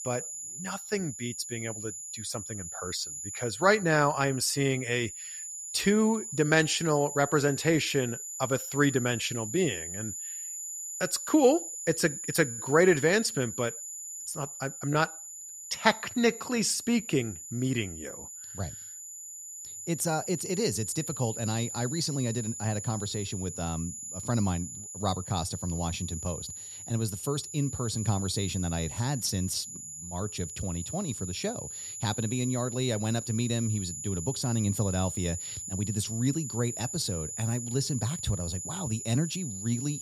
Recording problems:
high-pitched whine; loud; throughout; 7 kHz, 7 dB below the speech

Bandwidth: 14 kHz